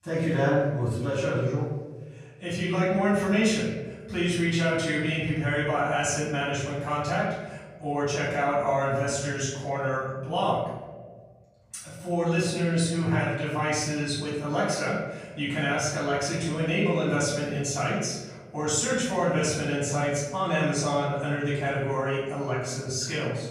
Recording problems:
off-mic speech; far
room echo; noticeable; dies away in 1.2 s

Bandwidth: 15 kHz